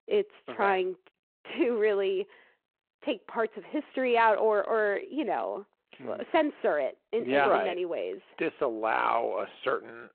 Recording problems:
phone-call audio

